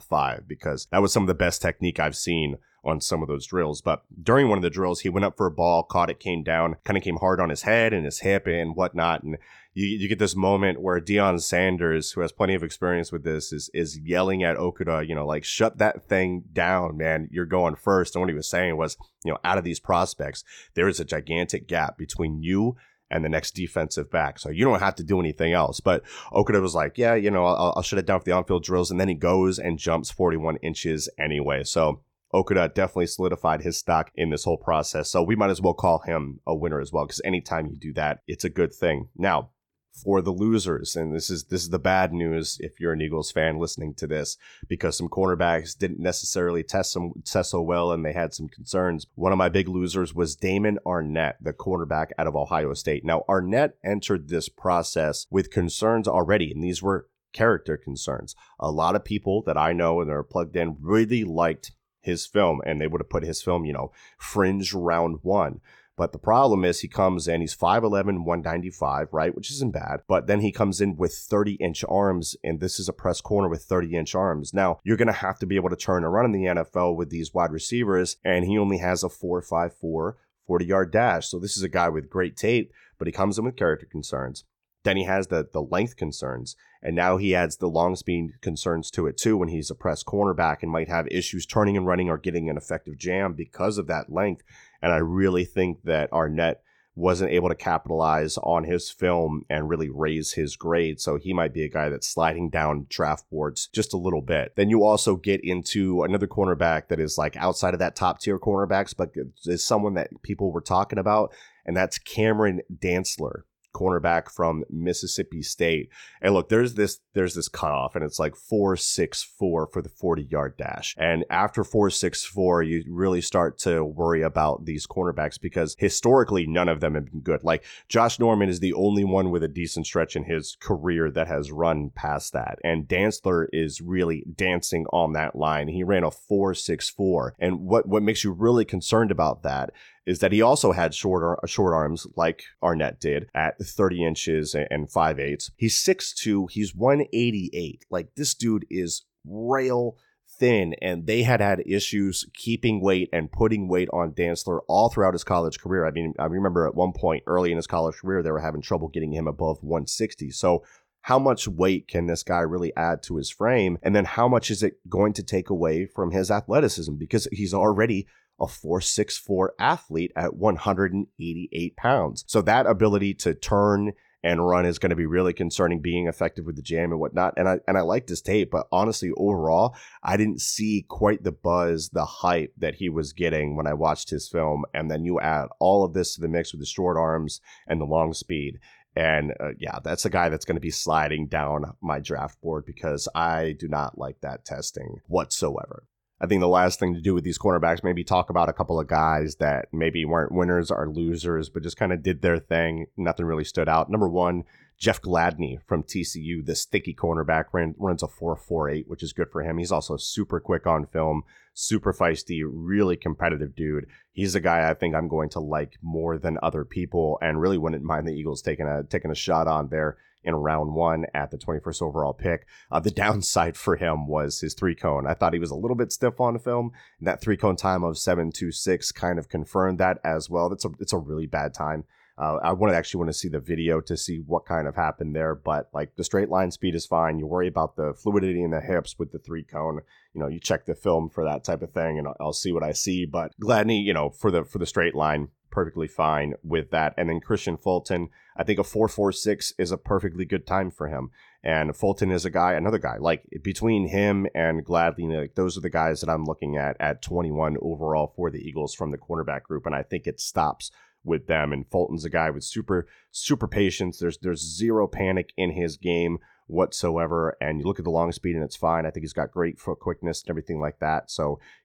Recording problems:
none

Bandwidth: 17.5 kHz